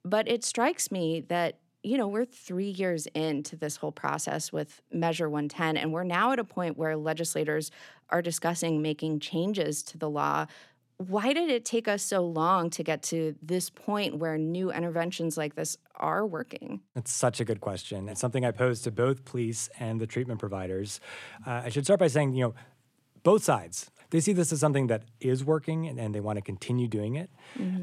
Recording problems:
abrupt cut into speech; at the end

